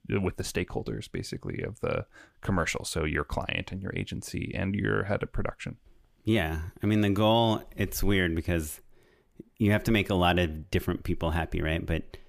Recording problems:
none

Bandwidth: 15 kHz